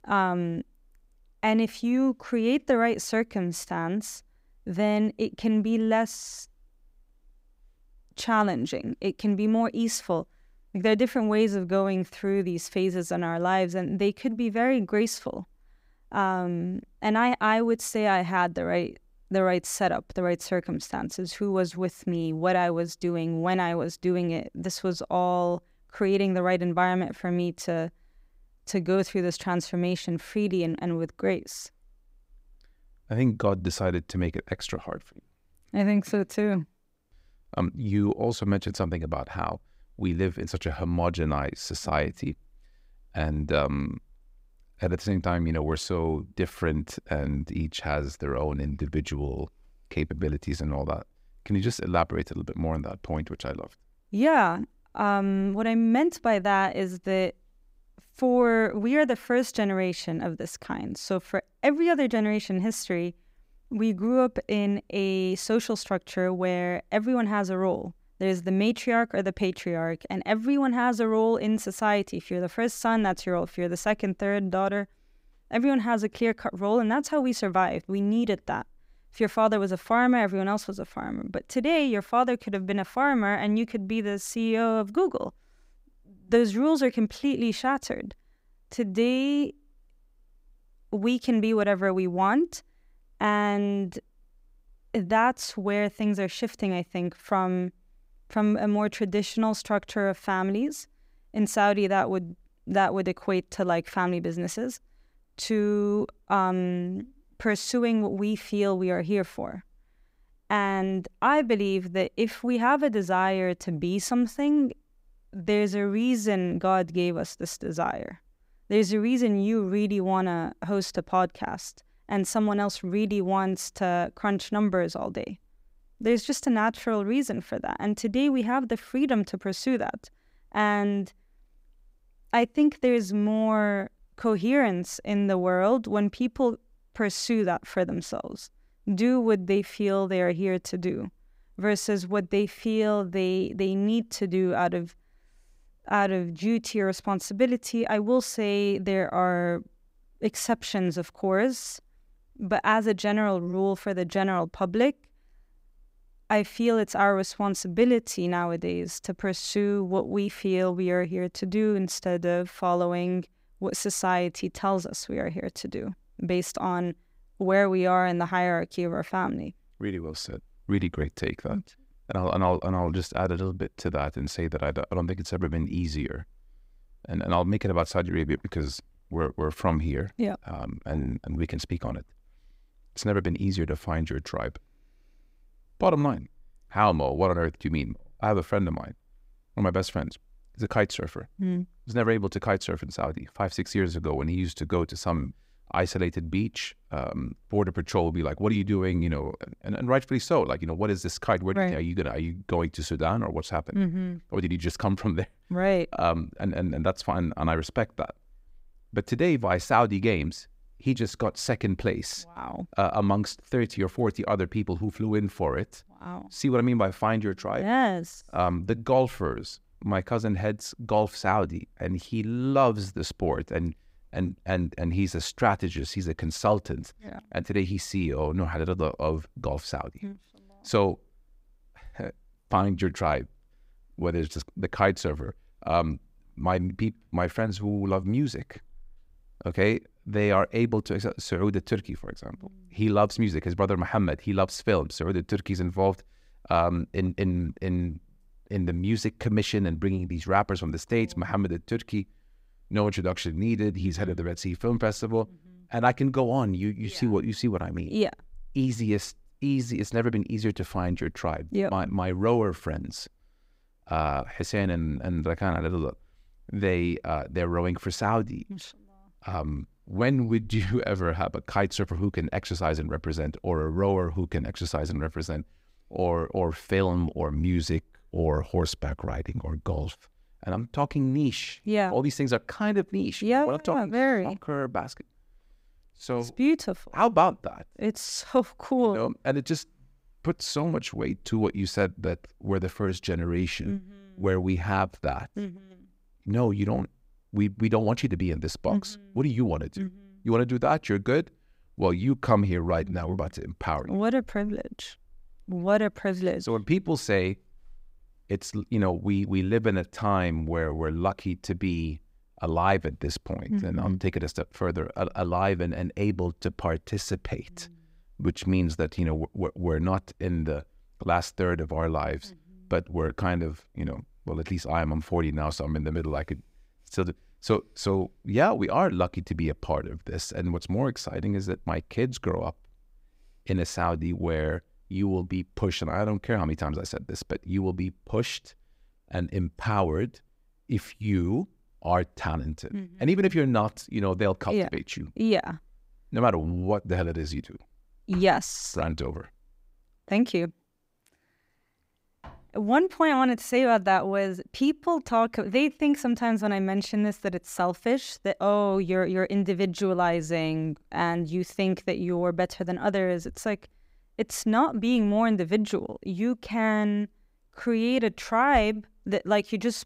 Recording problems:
none

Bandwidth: 15.5 kHz